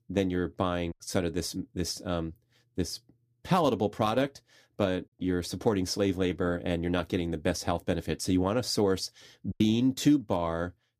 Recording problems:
choppy; occasionally; at 1 s and at 9.5 s; 2% of the speech affected

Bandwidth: 15 kHz